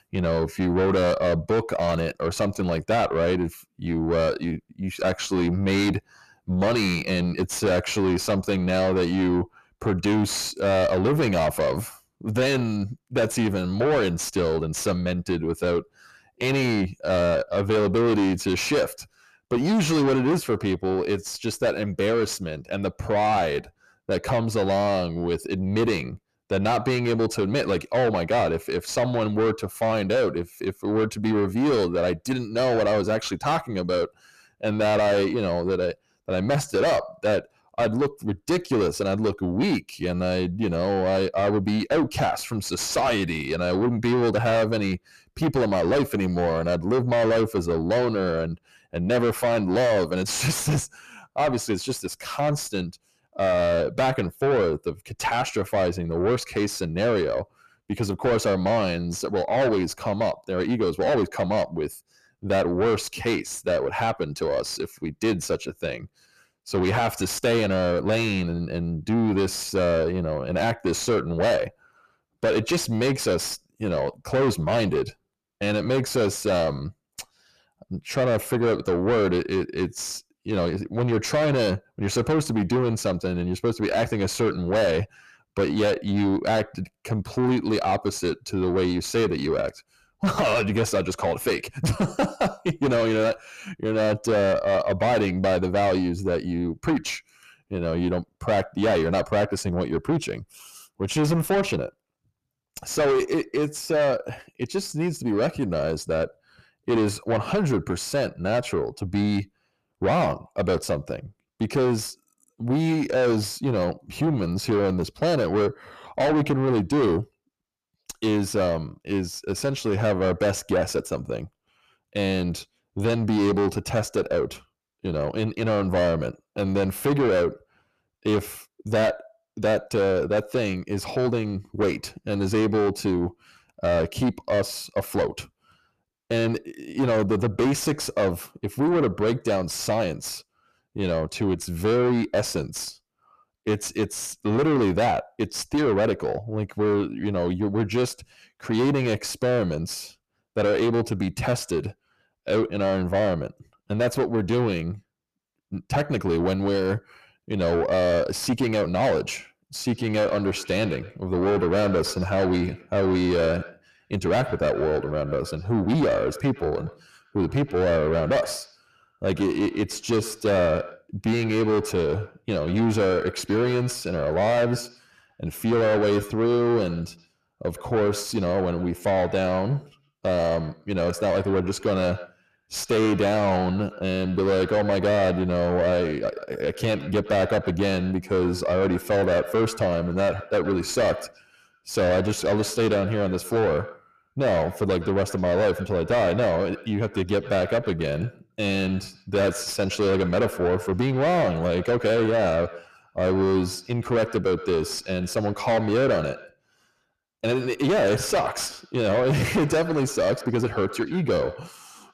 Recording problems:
distortion; heavy; 7 dB below the speech
echo of what is said; noticeable; from 2:40 on; 120 ms later, 15 dB below the speech

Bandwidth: 14.5 kHz